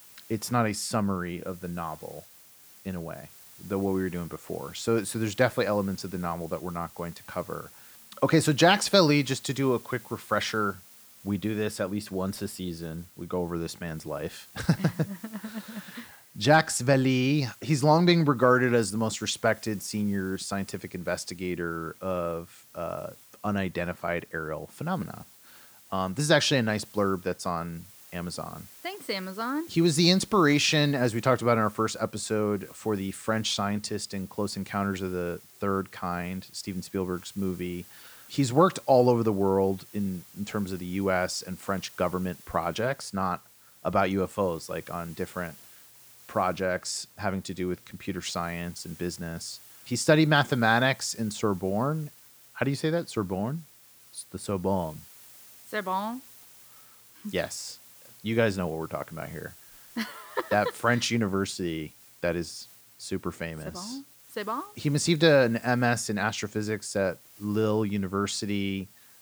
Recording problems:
hiss; faint; throughout; 20 dB below the speech

